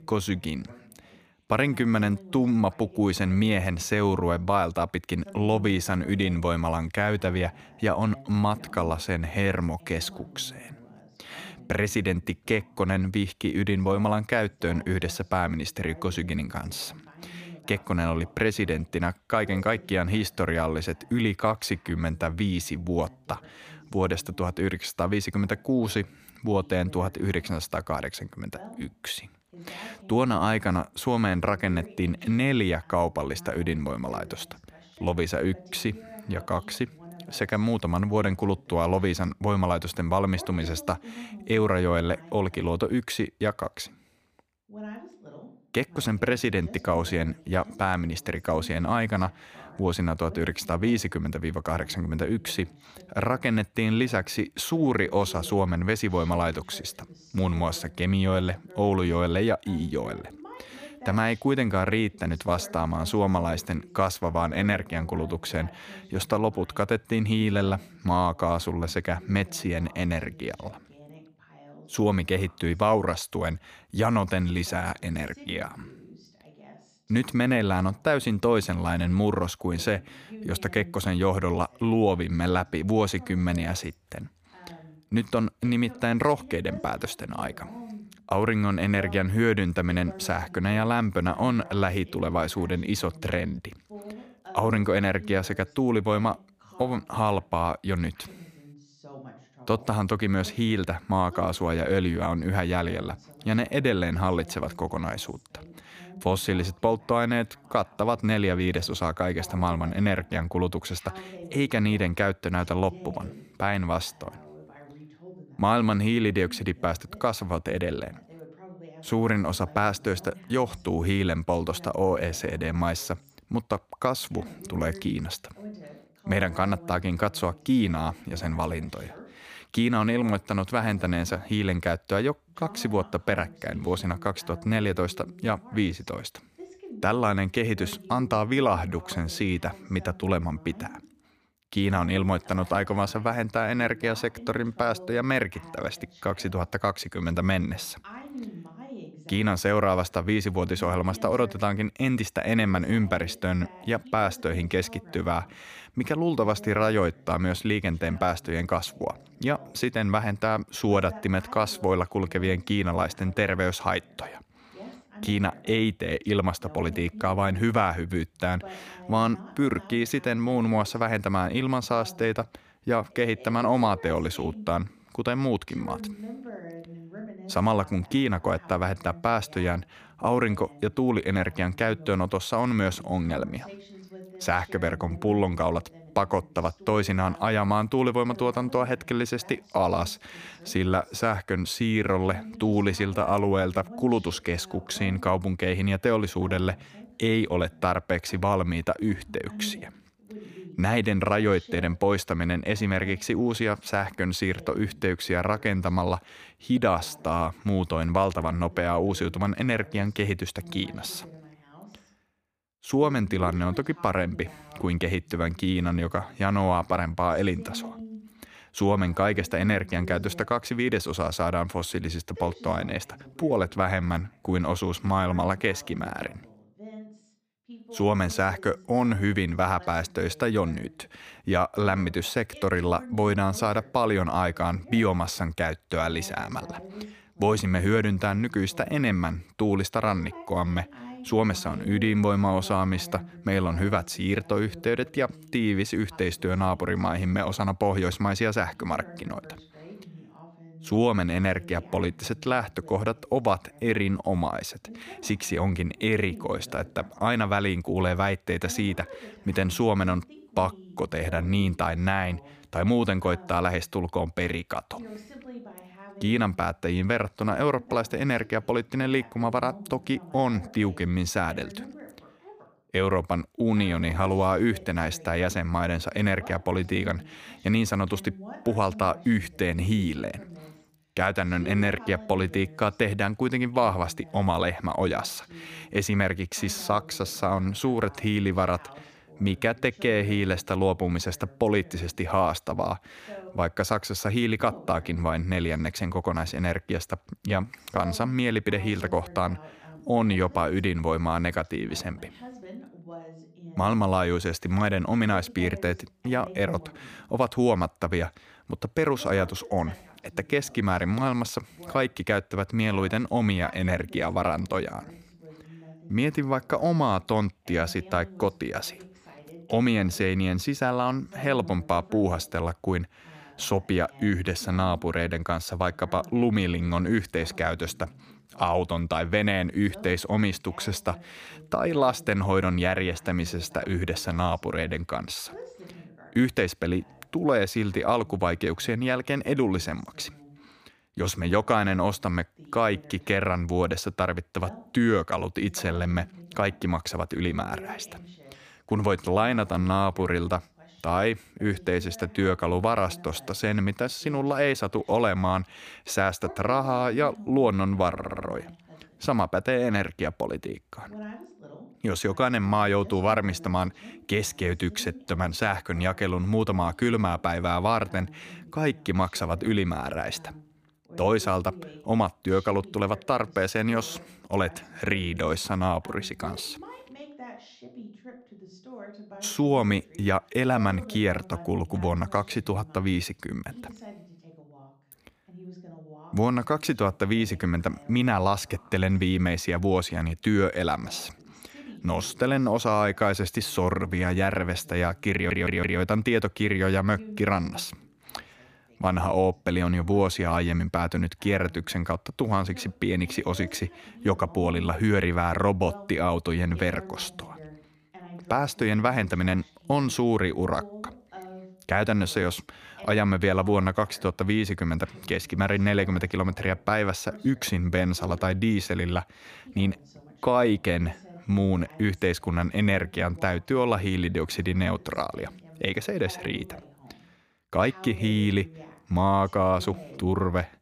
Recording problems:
voice in the background; faint; throughout; 20 dB below the speech
audio stuttering; at 5:58 and at 6:35

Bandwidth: 15 kHz